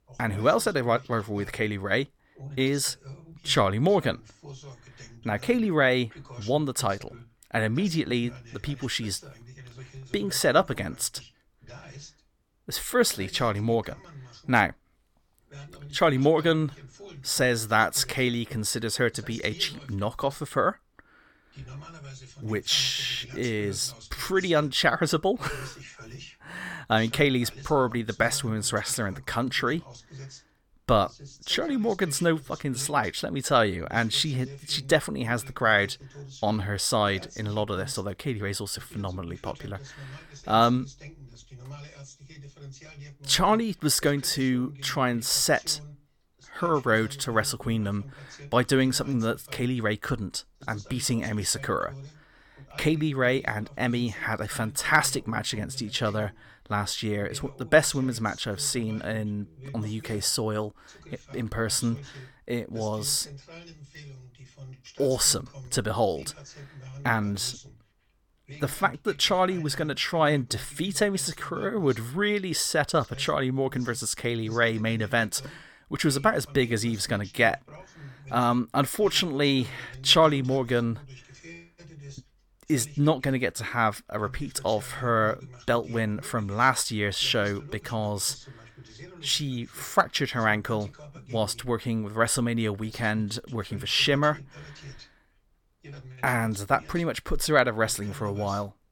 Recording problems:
voice in the background; noticeable; throughout; 20 dB below the speech

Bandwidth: 17.5 kHz